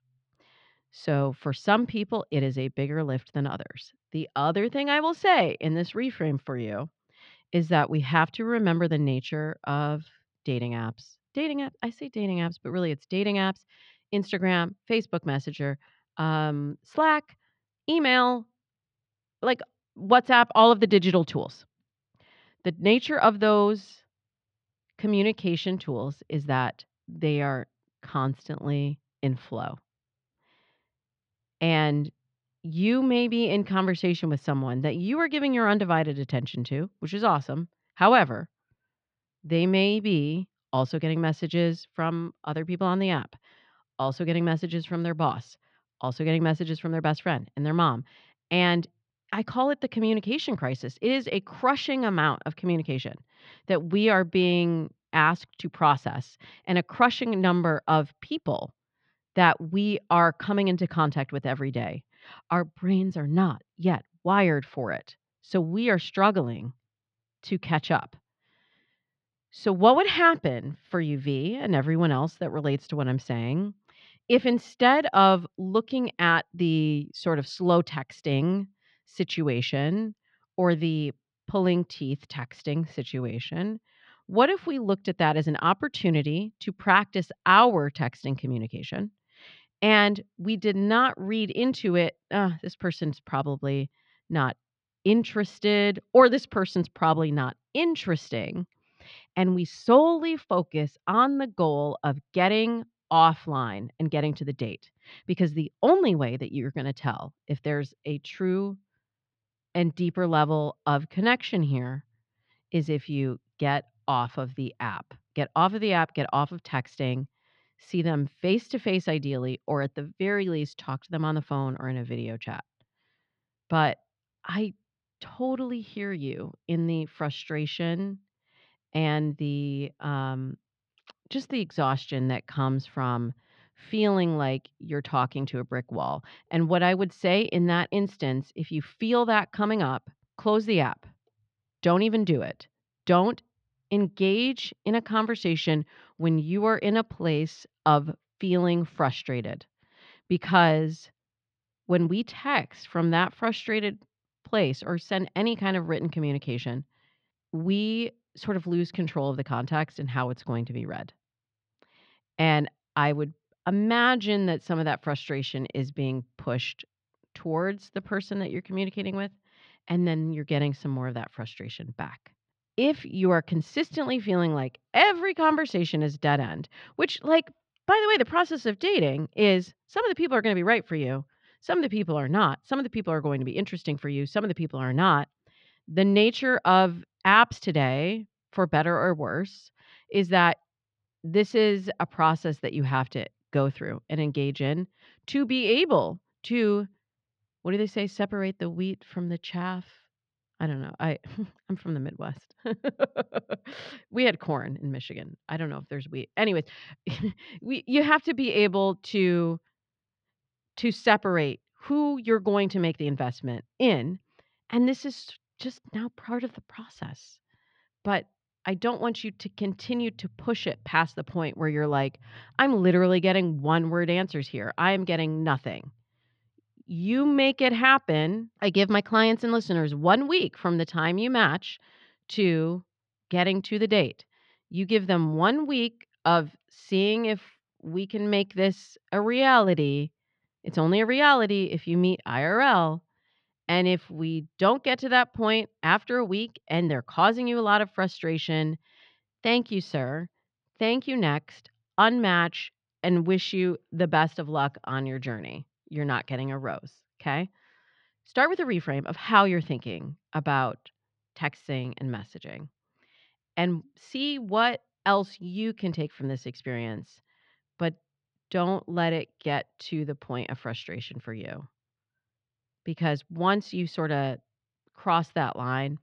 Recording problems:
muffled; slightly; fading above 4 kHz

